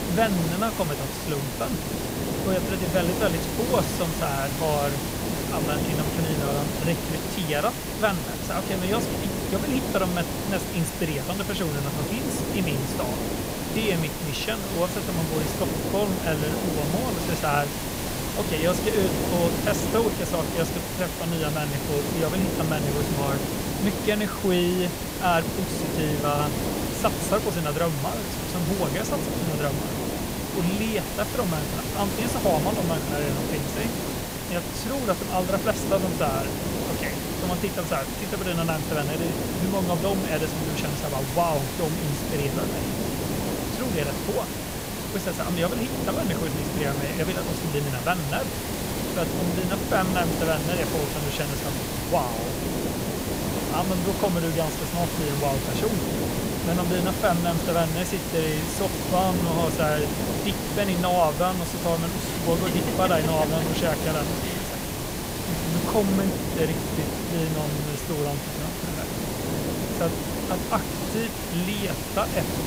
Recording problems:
hiss; loud; throughout; as loud as the speech

